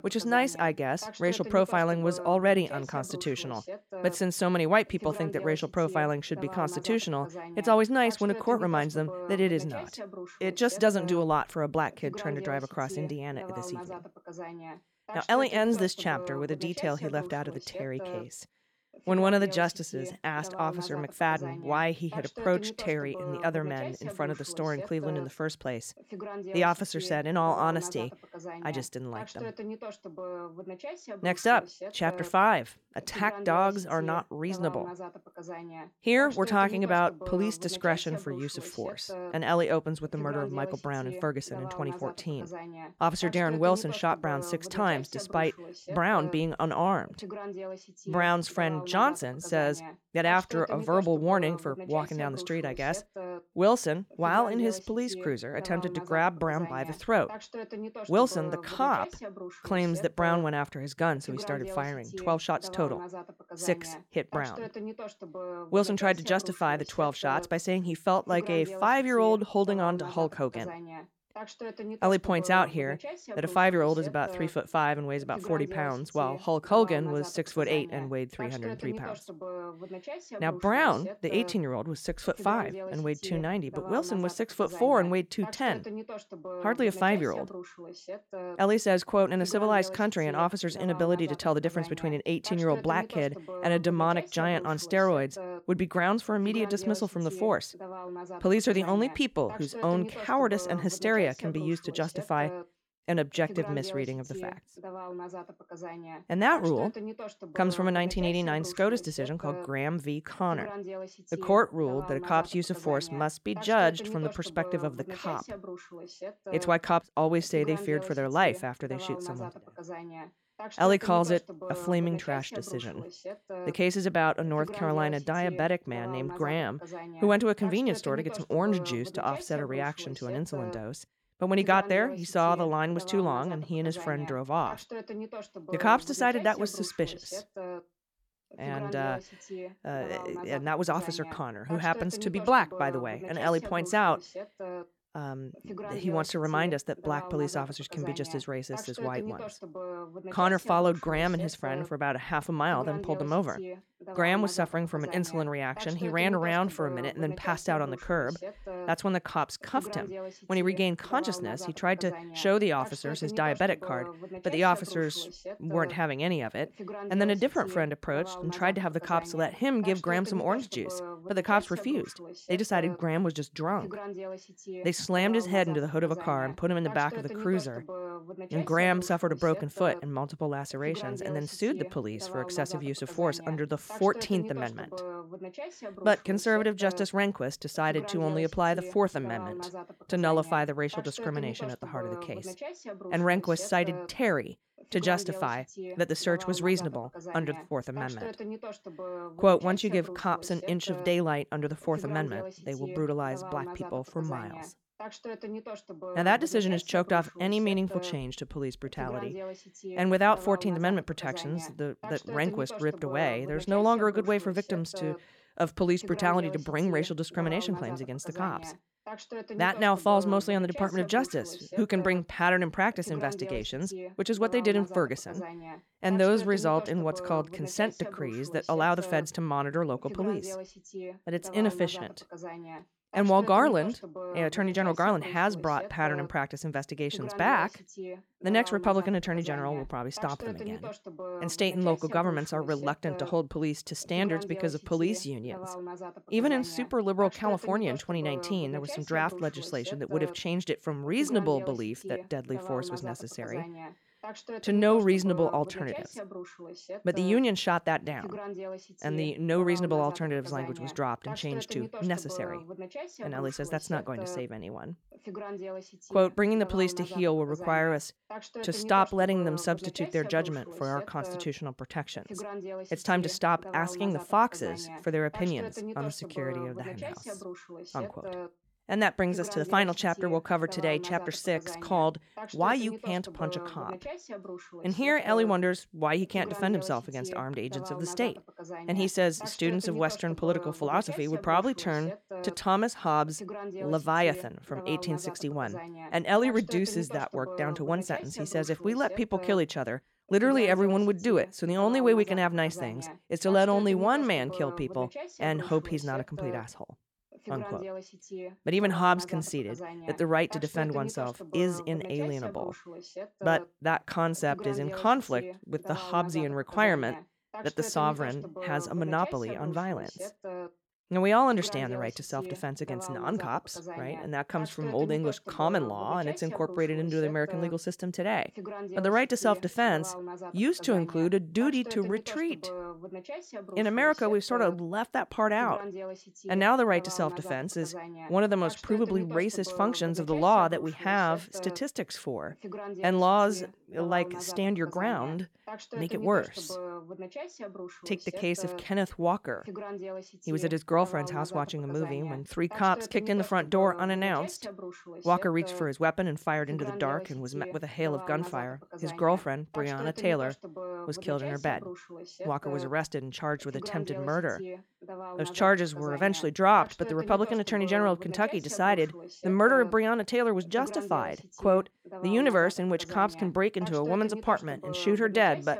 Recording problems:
voice in the background; noticeable; throughout; 15 dB below the speech

